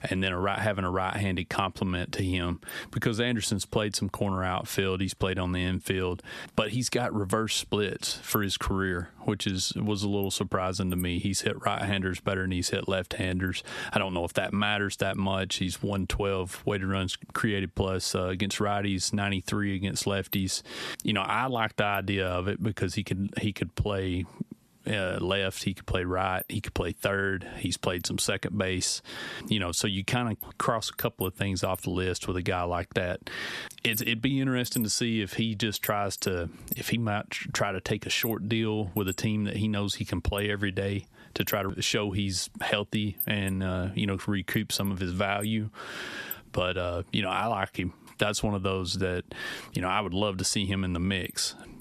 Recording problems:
squashed, flat; heavily

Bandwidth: 13.5 kHz